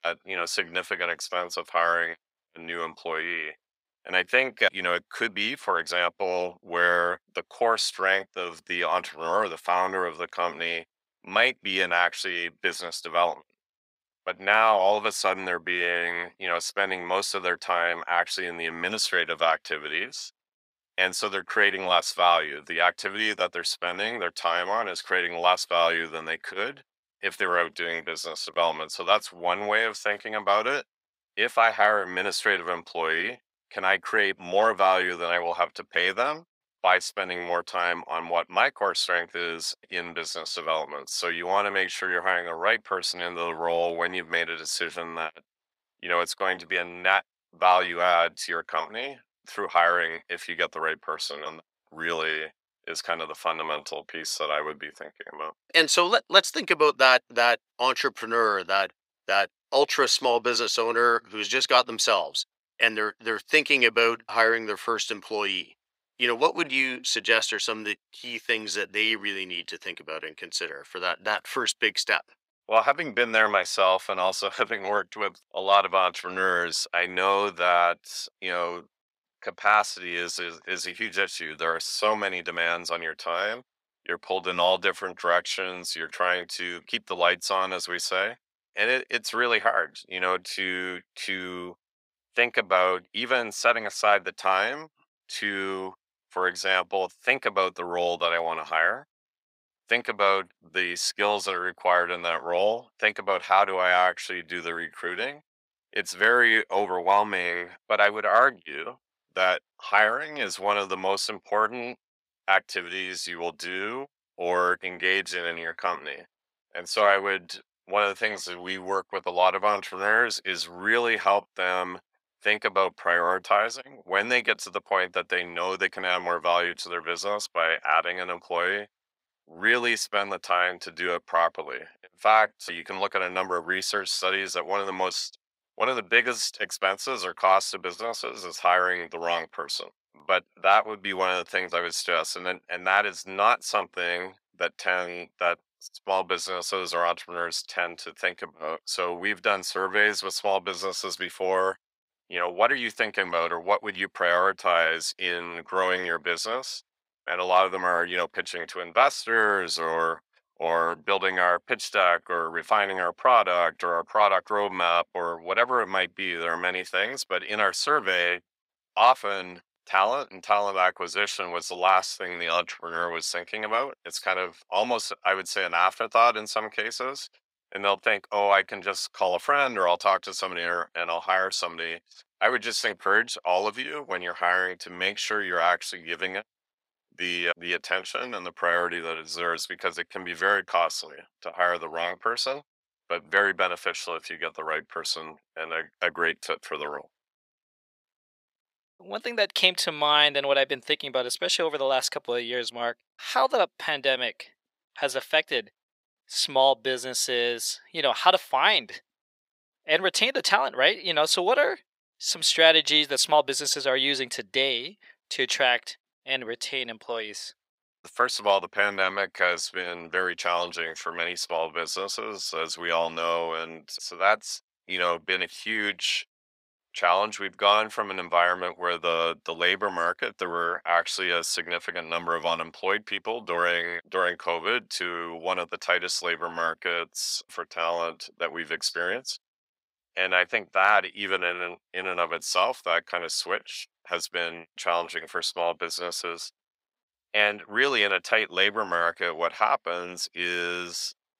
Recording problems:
thin; very; fading below 650 Hz

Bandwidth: 15.5 kHz